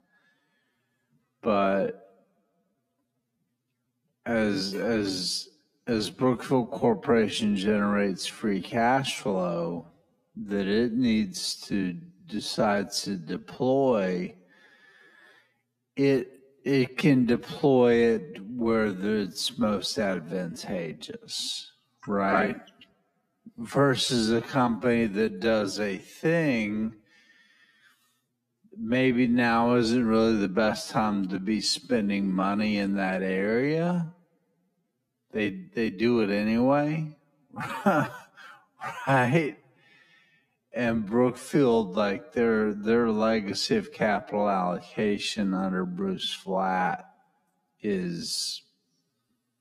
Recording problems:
wrong speed, natural pitch; too slow; 0.5 times normal speed

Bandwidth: 14.5 kHz